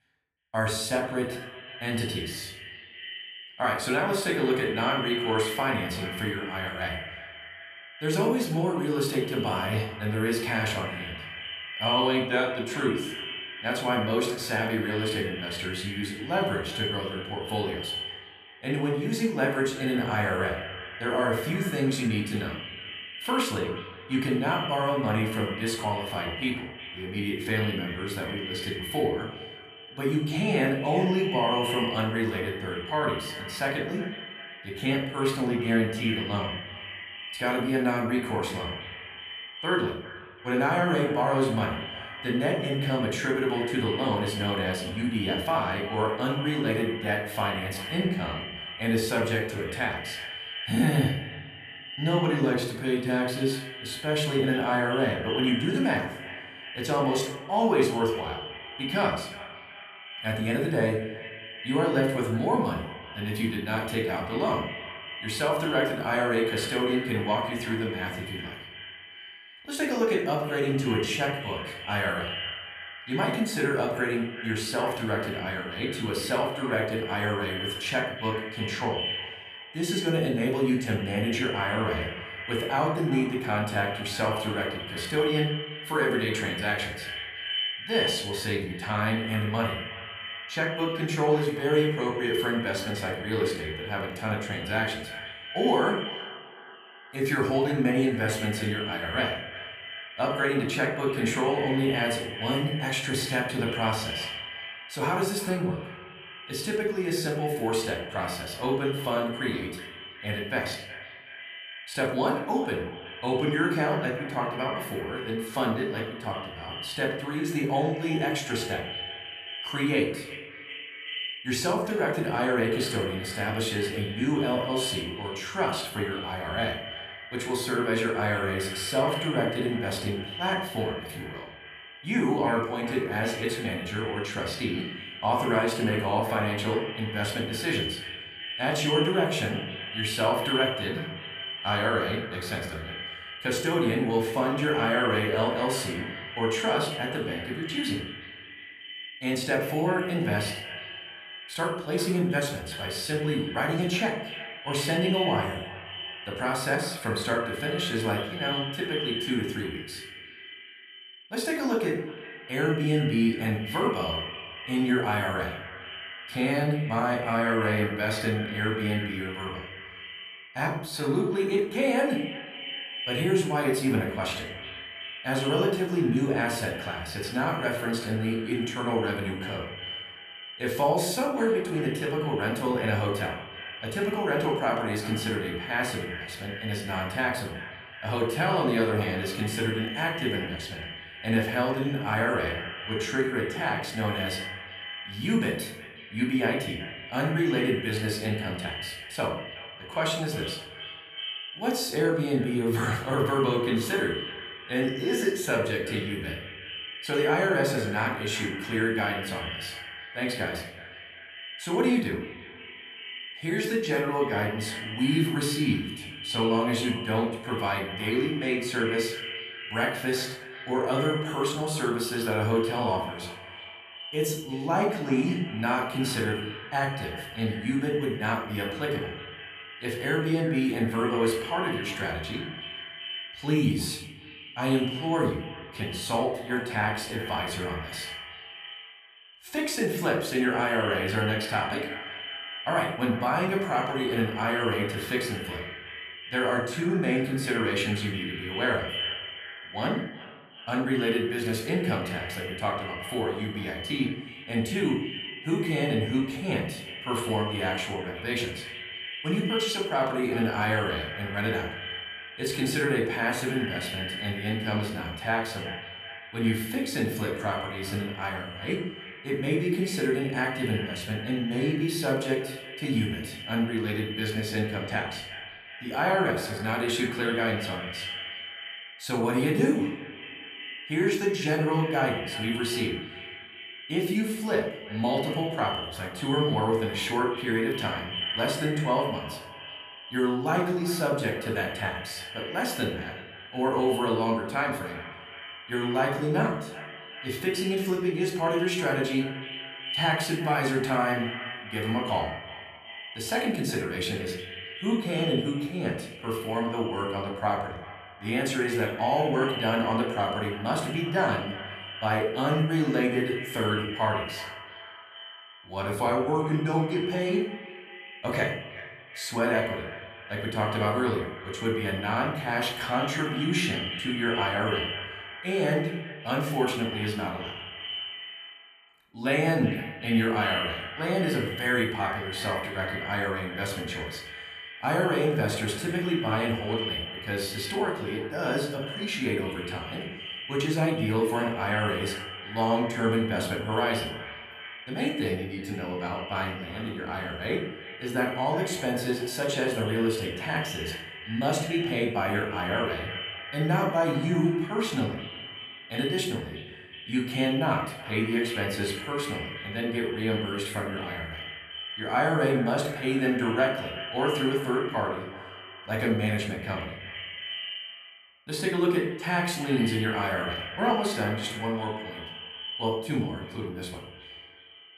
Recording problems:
echo of what is said; strong; throughout; 370 ms later, 9 dB below the speech
room echo; slight; dies away in 0.6 s
off-mic speech; somewhat distant

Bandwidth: 14.5 kHz